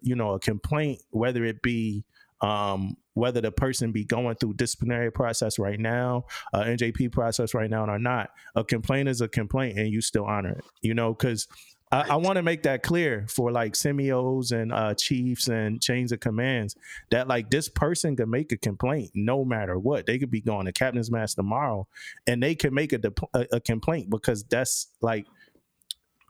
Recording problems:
squashed, flat; somewhat

